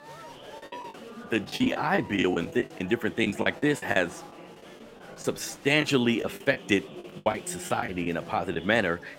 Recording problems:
murmuring crowd; noticeable; throughout; 15 dB below the speech
choppy; very; from 0.5 to 3 s, from 3 to 5 s and from 6 to 8.5 s; 16% of the speech affected

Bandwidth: 16 kHz